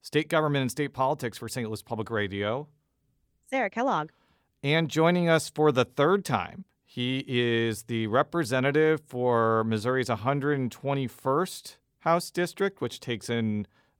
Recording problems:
none

